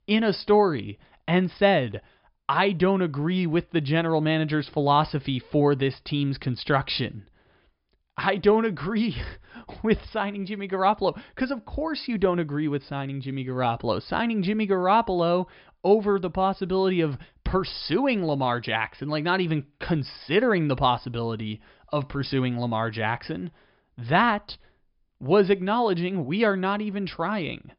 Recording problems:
high frequencies cut off; noticeable; nothing above 5.5 kHz

